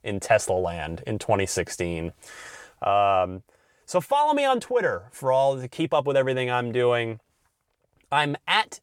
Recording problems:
none

